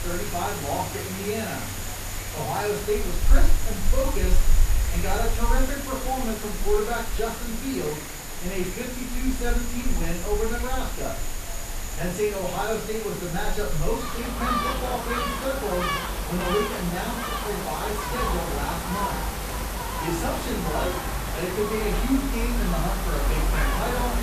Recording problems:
off-mic speech; far
room echo; noticeable; dies away in 0.4 s
animal sounds; loud; throughout; 1 dB below the speech
hiss; loud; throughout; 5 dB below the speech
voice in the background; faint; throughout; 25 dB below the speech

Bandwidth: 14.5 kHz